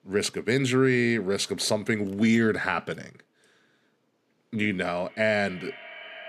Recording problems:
echo of what is said; noticeable; from 5 s on; 210 ms later, 20 dB below the speech

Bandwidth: 14.5 kHz